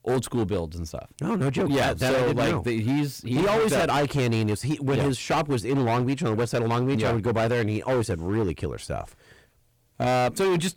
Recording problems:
distortion; heavy; 20% of the sound clipped

